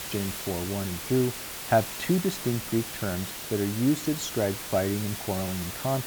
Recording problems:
hiss; loud; throughout; 6 dB below the speech

